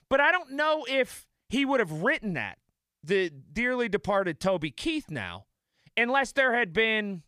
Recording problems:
none

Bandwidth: 15 kHz